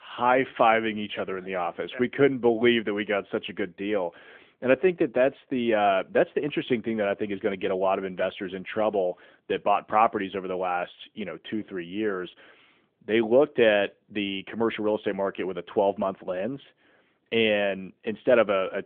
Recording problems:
phone-call audio; nothing above 3.5 kHz

